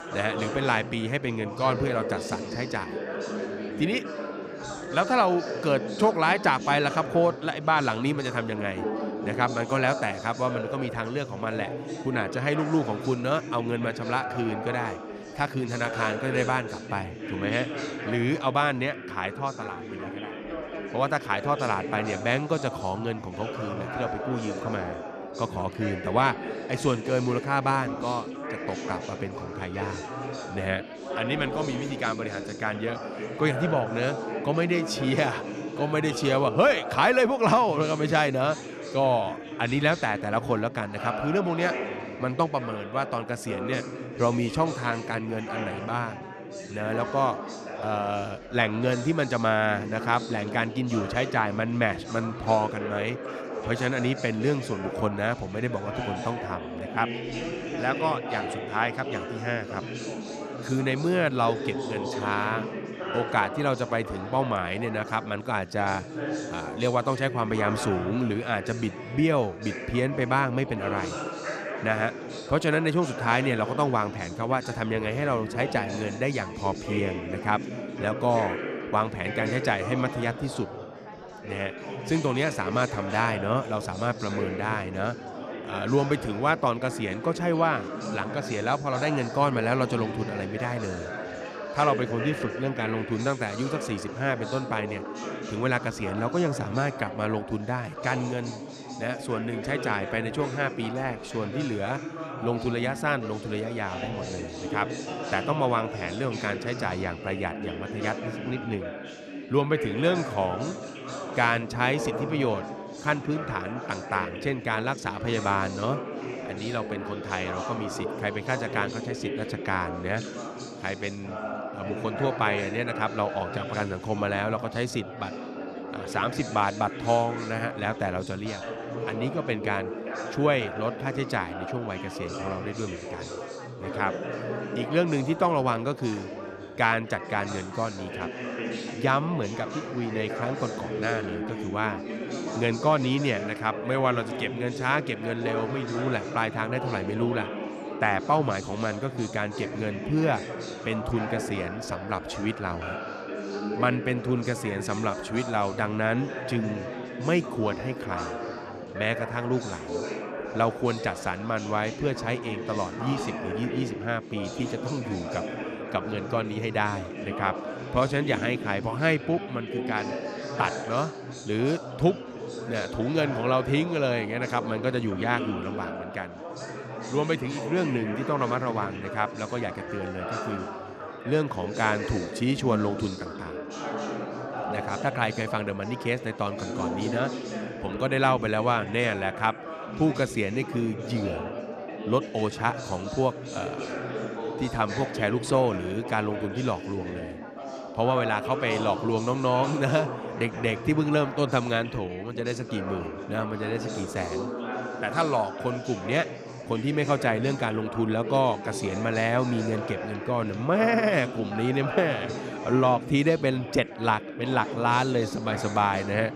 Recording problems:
chatter from many people; loud; throughout; 7 dB below the speech

